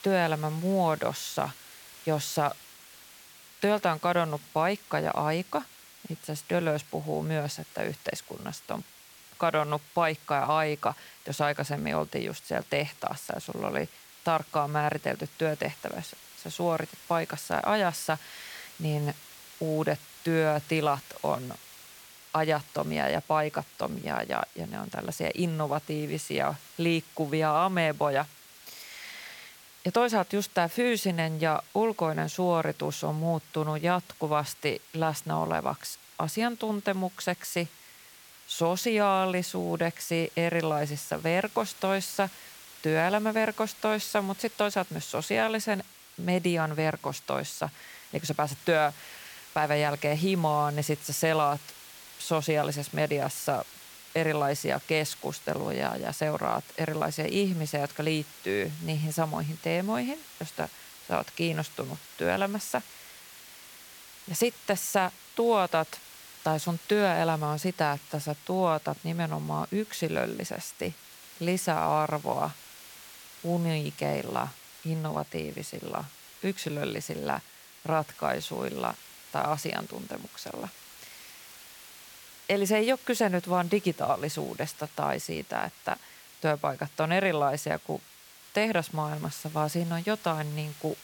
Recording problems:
hiss; noticeable; throughout; 20 dB below the speech

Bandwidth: 17.5 kHz